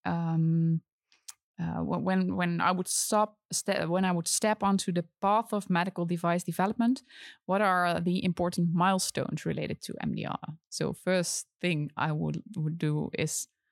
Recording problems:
none

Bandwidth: 16.5 kHz